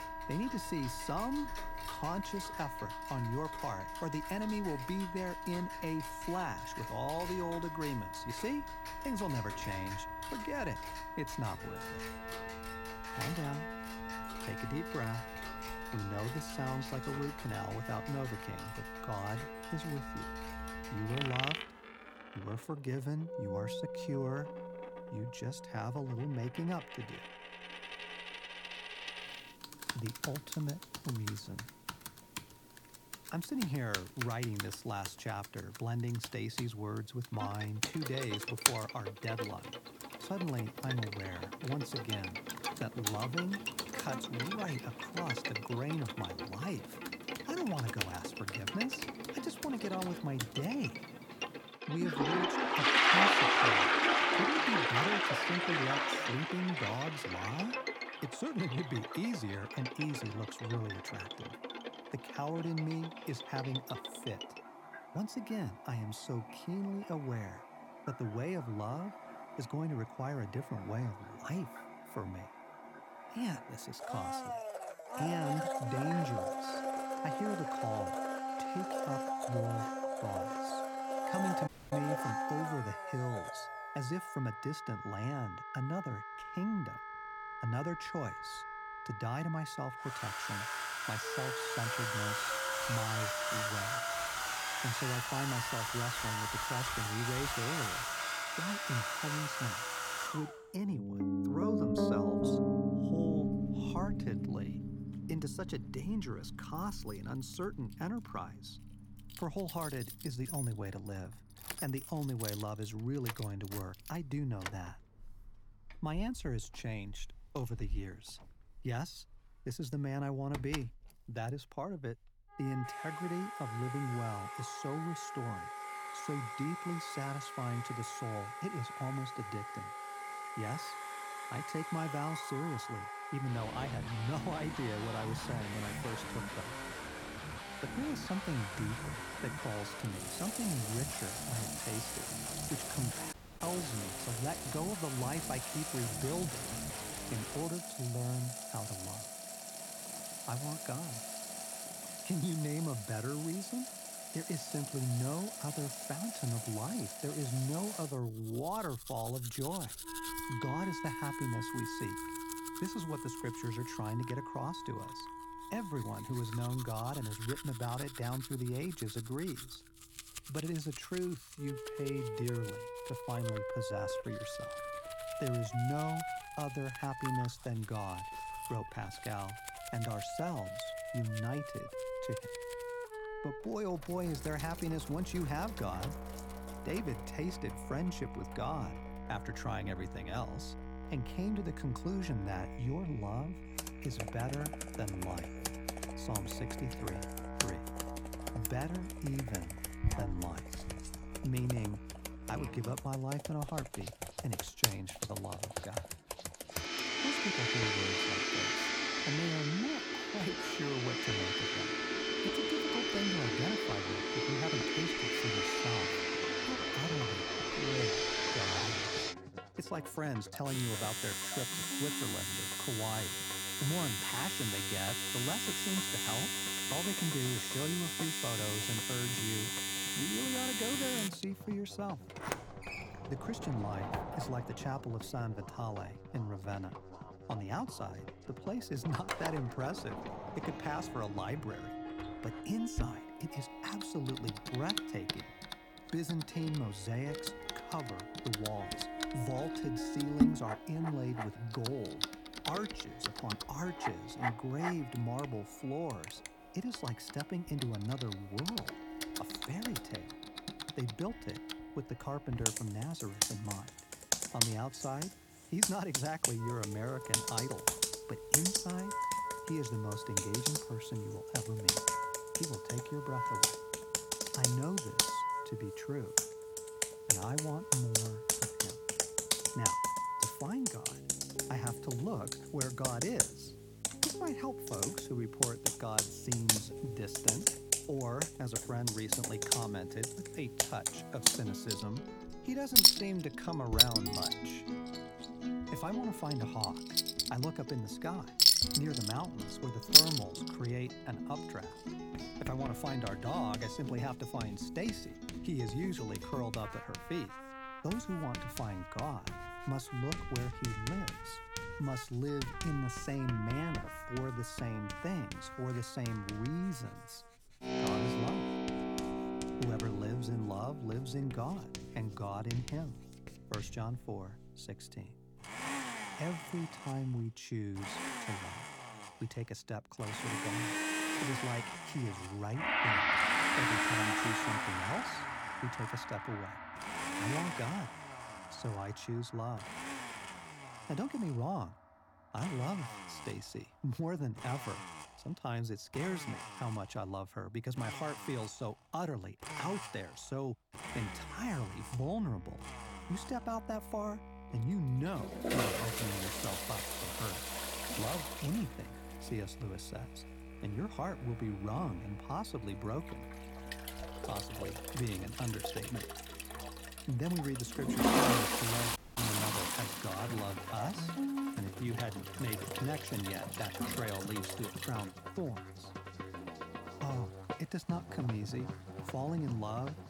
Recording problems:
household noises; very loud; throughout; 4 dB above the speech
background music; loud; throughout; 3 dB below the speech
audio cutting out; at 1:22, at 2:23 and at 6:09

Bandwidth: 18 kHz